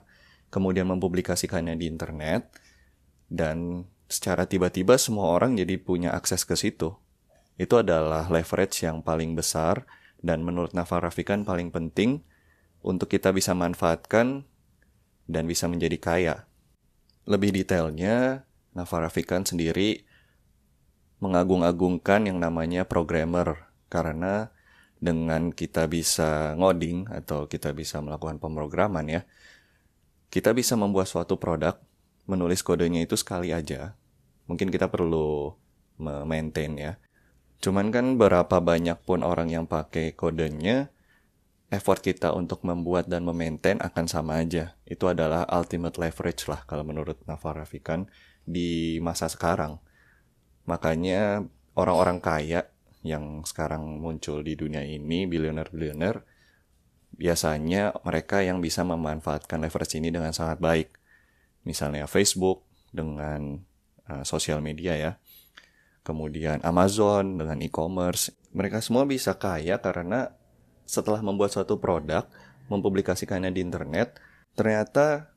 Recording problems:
none

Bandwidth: 14.5 kHz